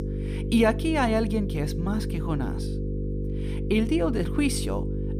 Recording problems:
electrical hum; loud; throughout; 50 Hz, 10 dB below the speech

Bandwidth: 15 kHz